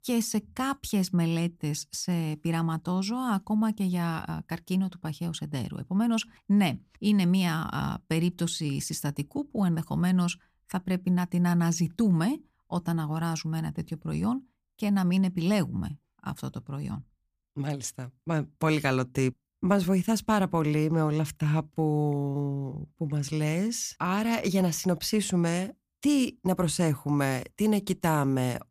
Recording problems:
none

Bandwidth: 15 kHz